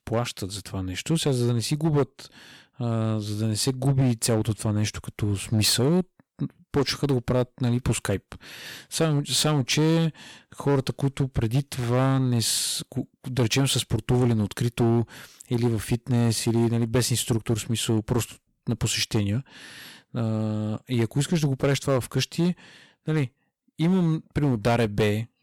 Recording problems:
distortion; slight; 6% of the sound clipped

